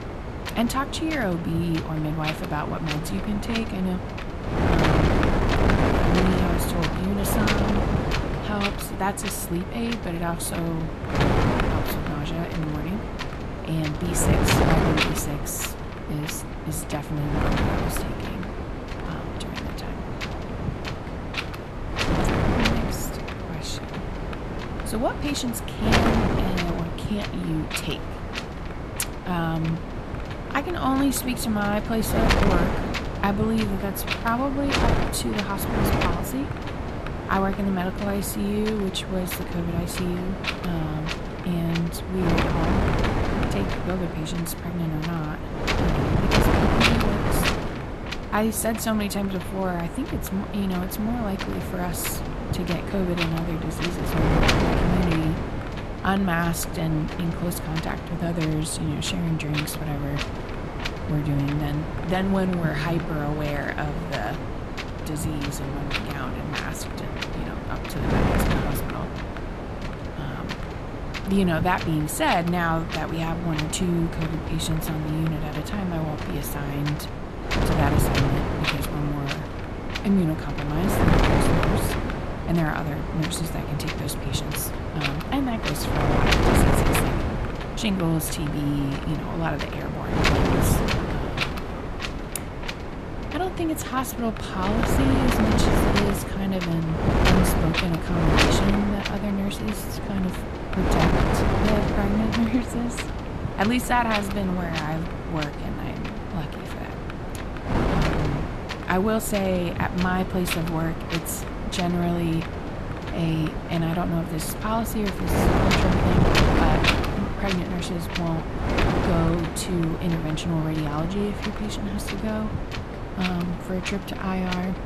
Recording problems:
wind noise on the microphone; heavy; 2 dB above the speech

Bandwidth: 13.5 kHz